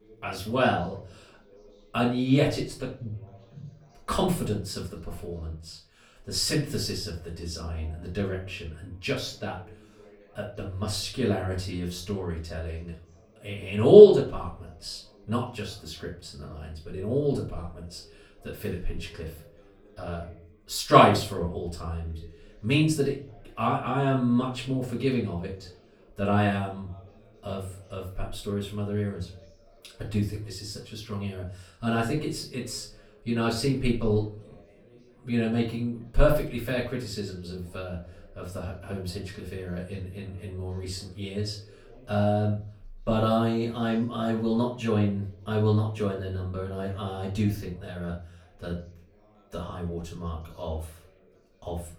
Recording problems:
off-mic speech; far
room echo; slight; dies away in 0.3 s
background chatter; faint; throughout; 4 voices, 30 dB below the speech

